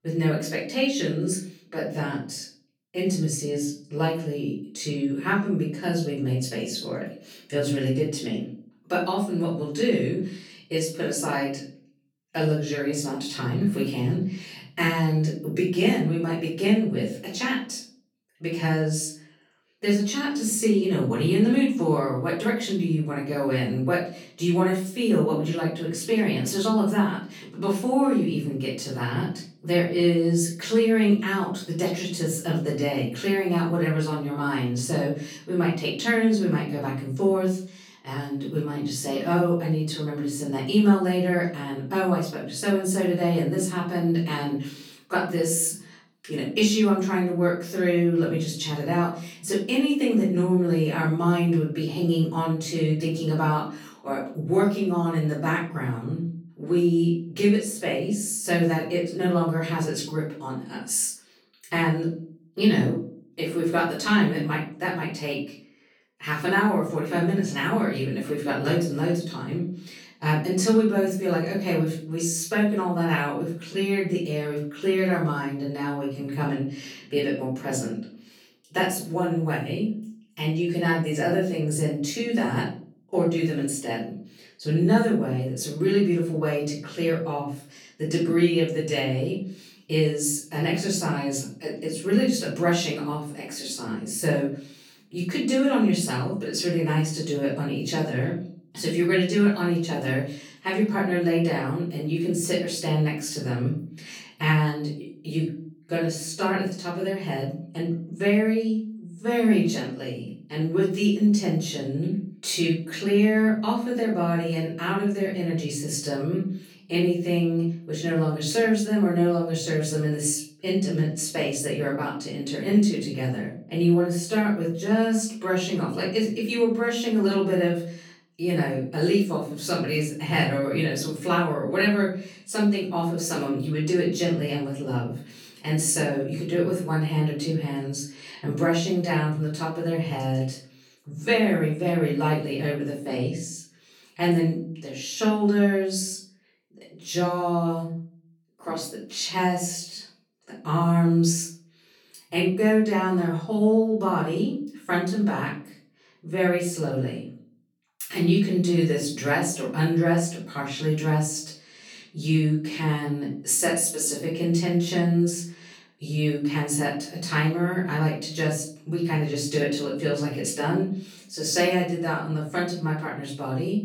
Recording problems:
off-mic speech; far
room echo; noticeable; dies away in 0.4 s

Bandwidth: 18 kHz